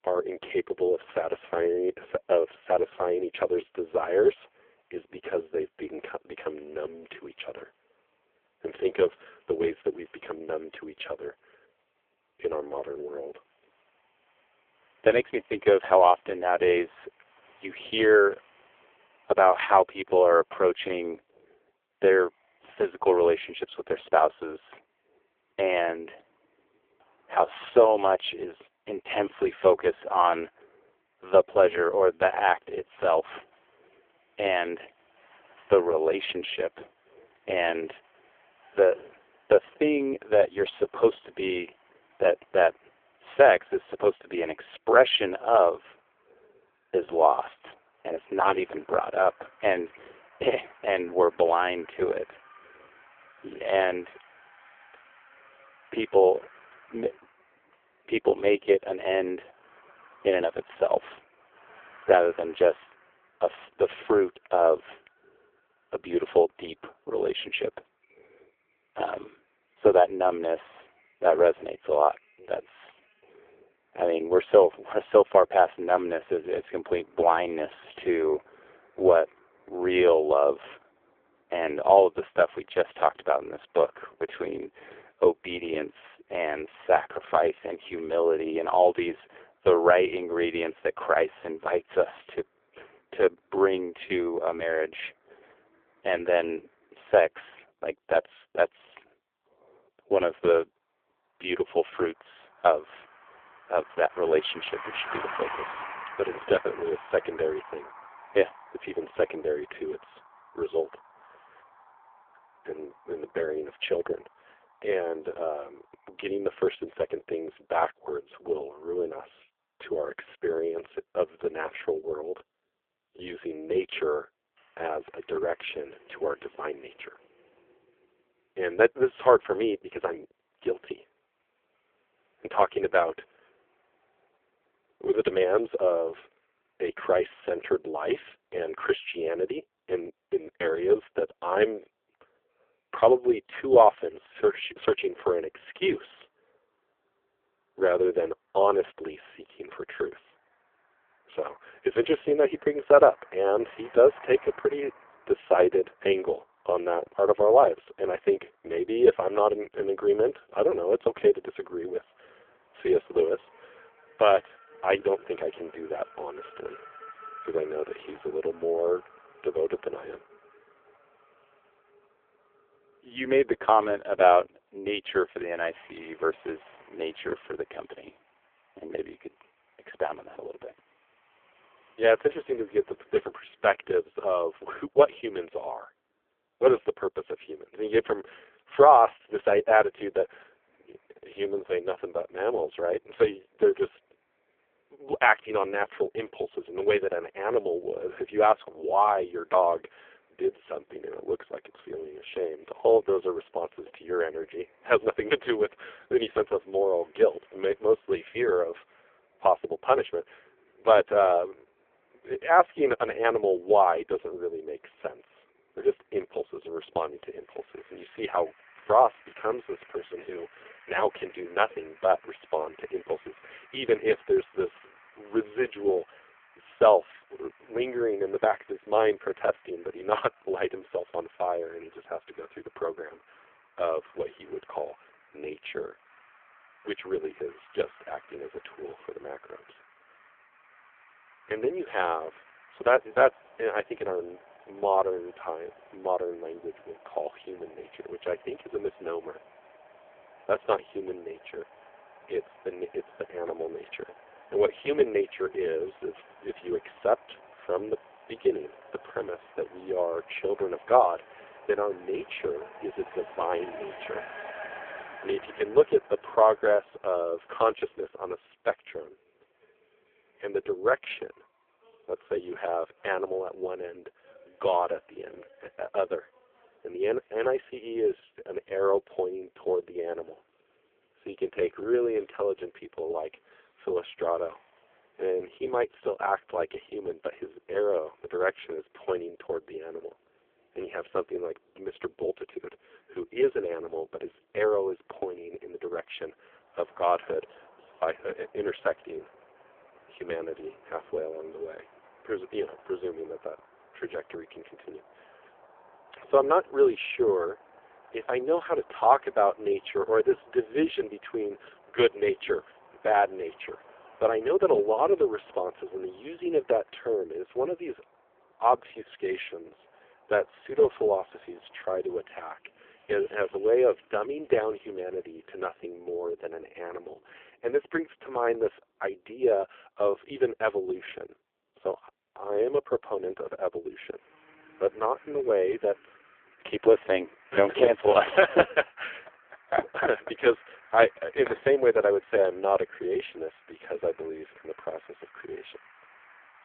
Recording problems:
phone-call audio; poor line; nothing above 3.5 kHz
traffic noise; faint; throughout; 25 dB below the speech

